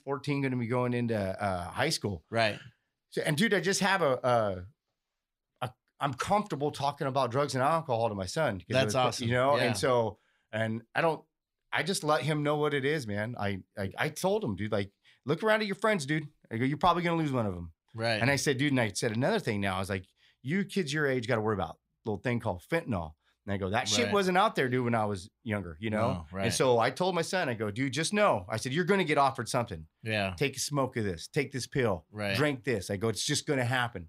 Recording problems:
none

